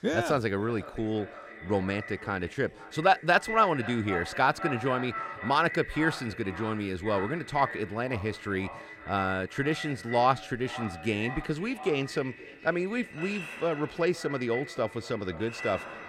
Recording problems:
echo of what is said; strong; throughout; 510 ms later, 10 dB below the speech
household noises; noticeable; throughout; 15 dB below the speech

